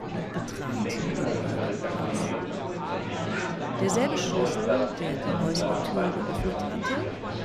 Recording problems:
murmuring crowd; very loud; throughout; 4 dB above the speech

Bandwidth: 14.5 kHz